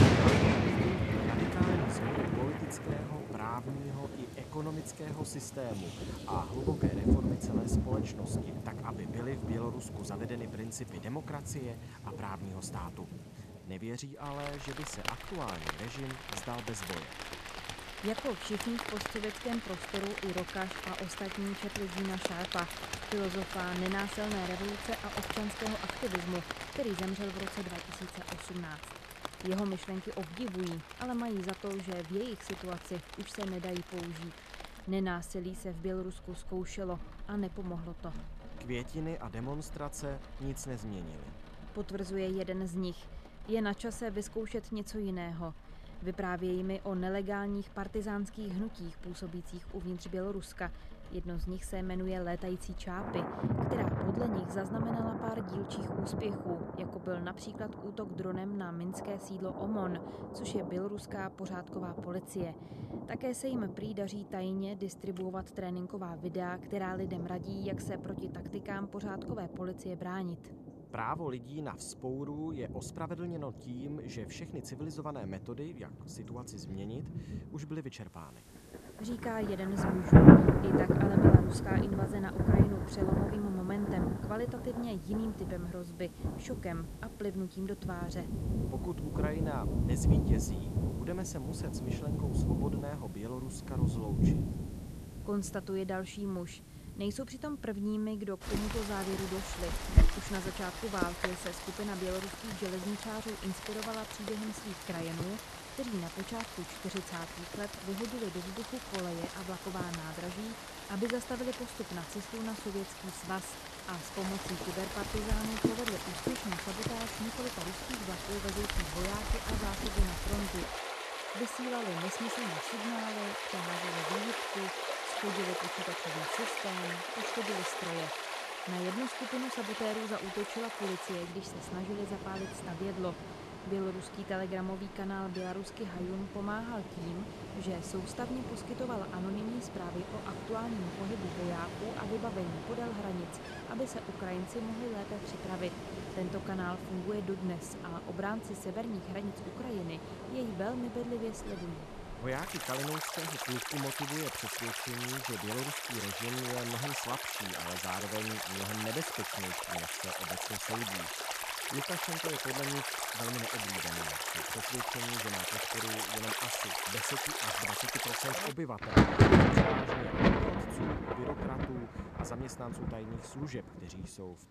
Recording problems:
rain or running water; very loud; throughout; 5 dB above the speech

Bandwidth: 14.5 kHz